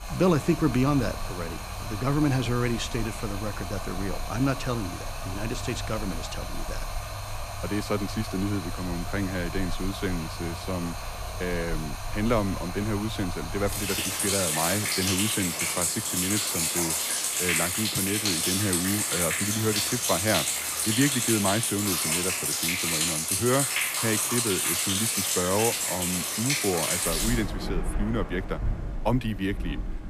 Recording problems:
rain or running water; very loud; throughout; 2 dB above the speech

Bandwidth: 14.5 kHz